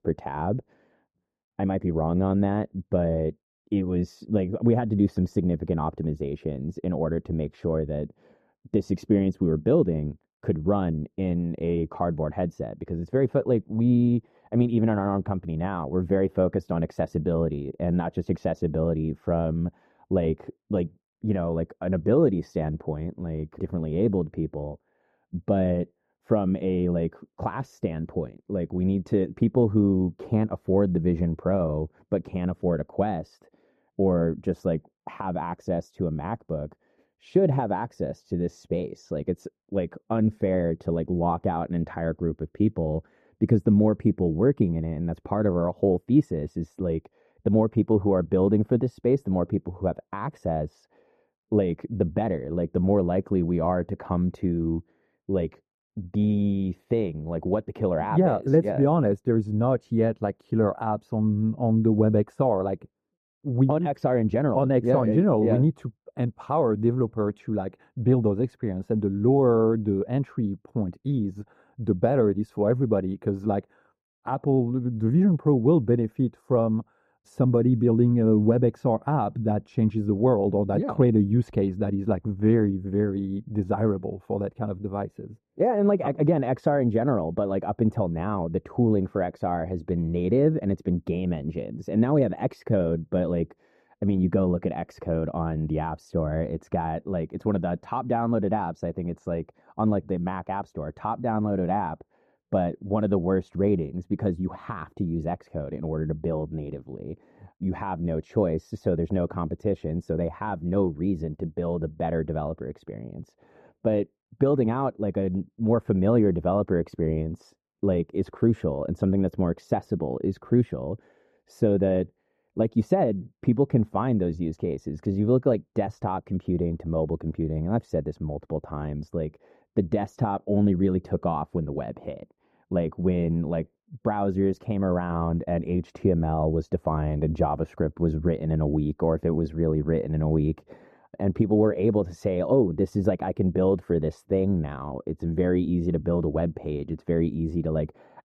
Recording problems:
muffled; very; fading above 1.5 kHz

